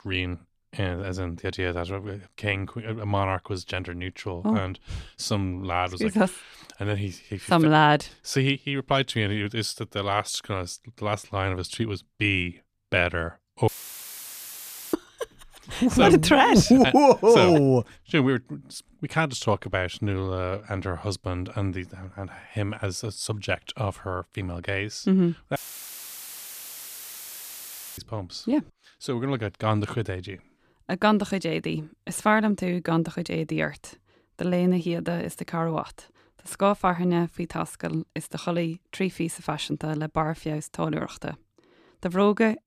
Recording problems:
audio cutting out; filled with static; at 14 s for 1.5 s and at 26 s for 2.5 s

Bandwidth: 14.5 kHz